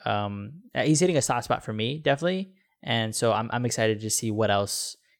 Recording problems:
none

